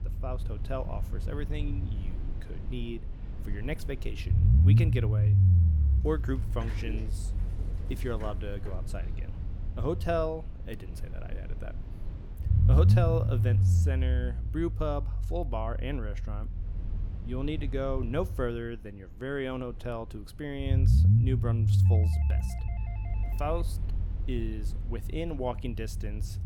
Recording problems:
low rumble; loud; throughout; 7 dB below the speech
door banging; noticeable; from 5.5 to 9.5 s; peak 7 dB below the speech
doorbell; faint; from 22 to 24 s; peak 15 dB below the speech

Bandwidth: 18 kHz